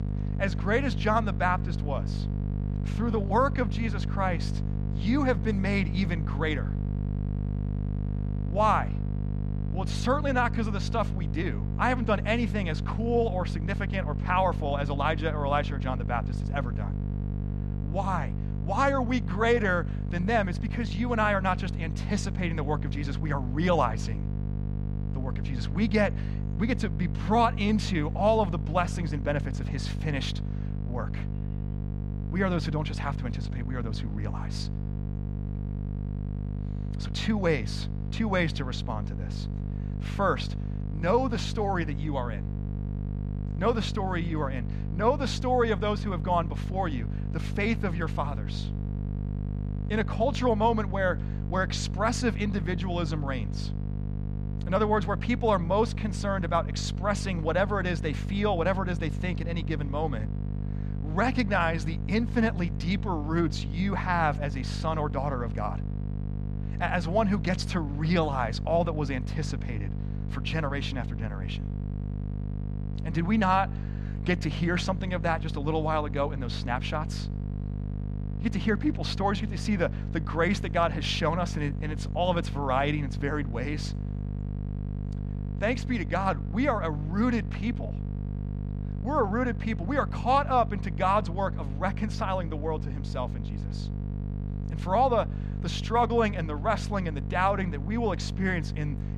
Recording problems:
electrical hum; noticeable; throughout; 50 Hz, 15 dB below the speech

